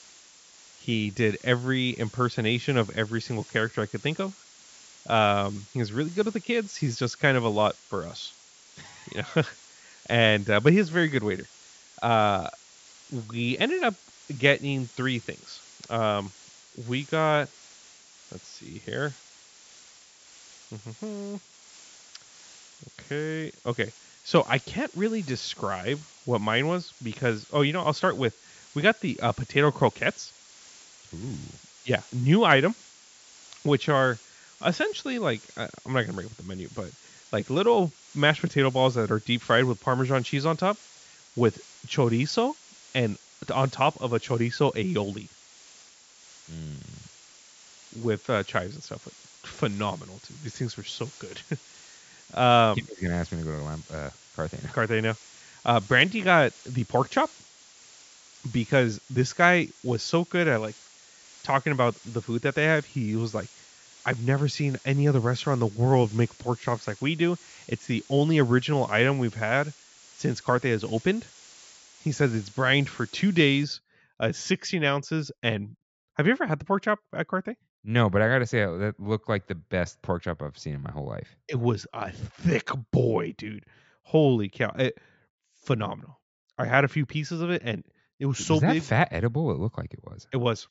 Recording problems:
high frequencies cut off; noticeable; nothing above 8 kHz
hiss; faint; until 1:14; 25 dB below the speech

